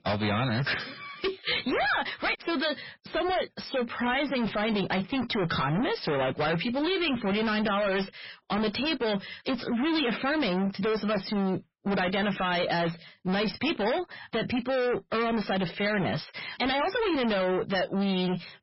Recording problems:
distortion; heavy; 36% of the sound clipped
garbled, watery; badly; nothing above 5.5 kHz

